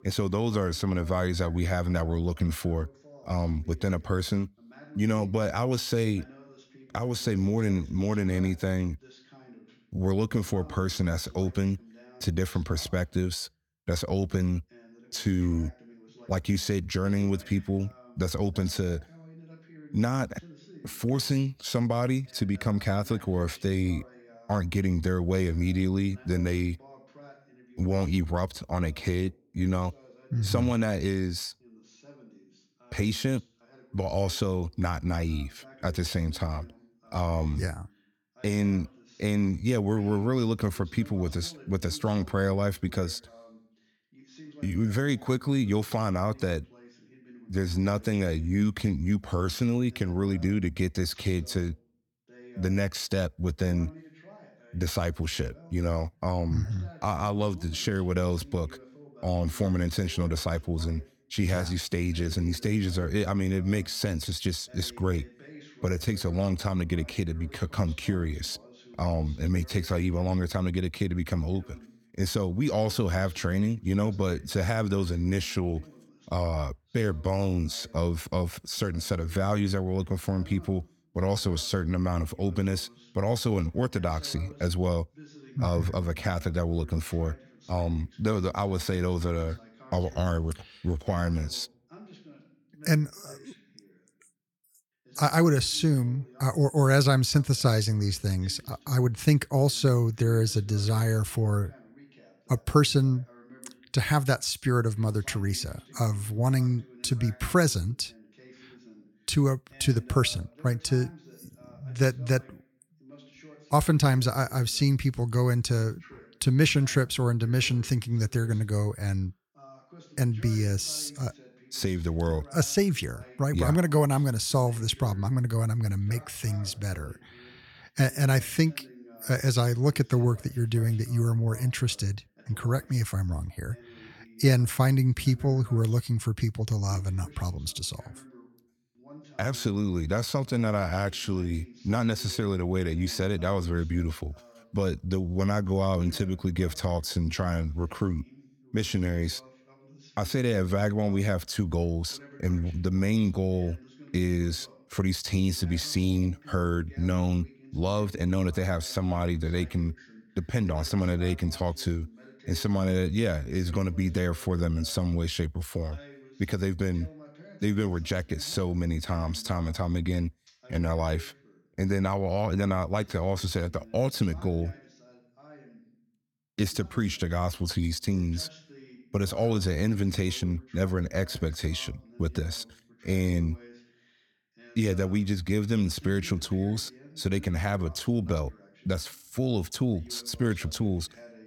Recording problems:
voice in the background; faint; throughout; 25 dB below the speech

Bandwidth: 17.5 kHz